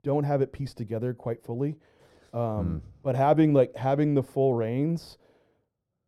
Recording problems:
muffled; very; fading above 1.5 kHz

